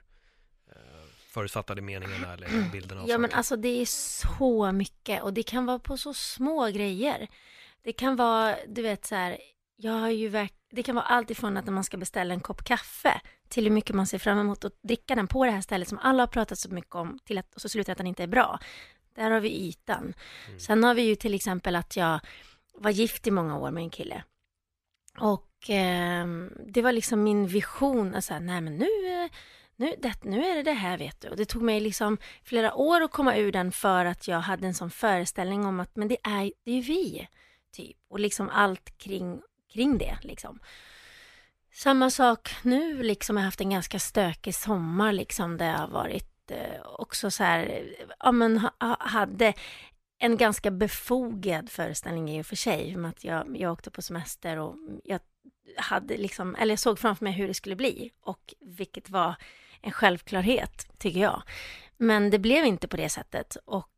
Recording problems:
uneven, jittery; strongly; from 15 to 59 s

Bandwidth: 14.5 kHz